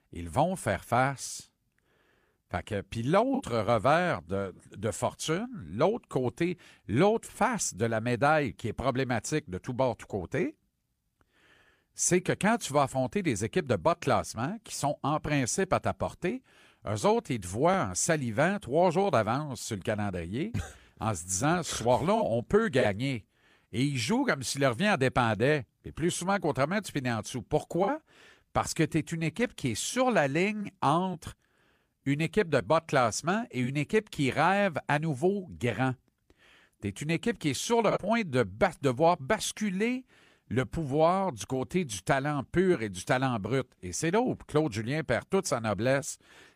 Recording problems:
none

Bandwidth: 15 kHz